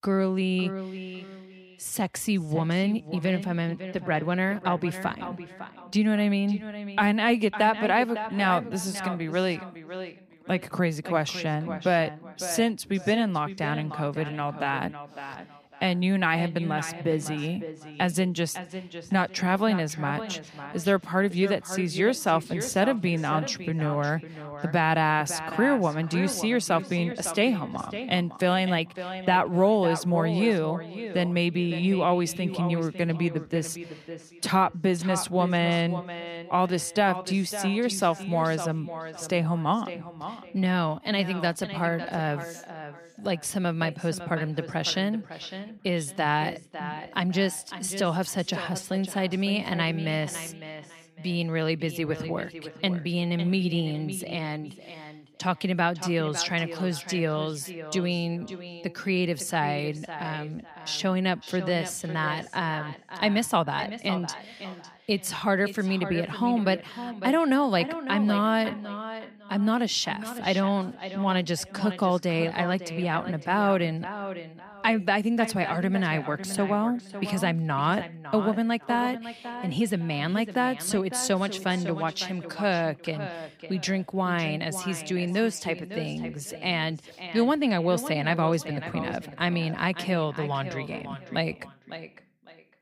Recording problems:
echo of what is said; strong; throughout; 550 ms later, 10 dB below the speech

